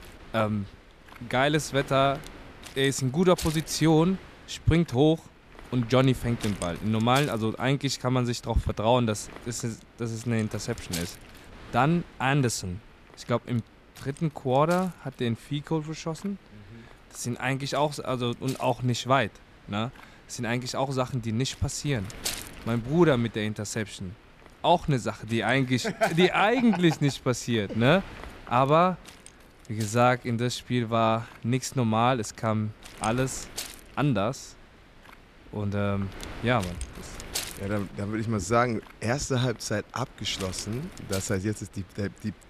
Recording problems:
wind noise on the microphone; occasional gusts; 15 dB below the speech

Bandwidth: 14.5 kHz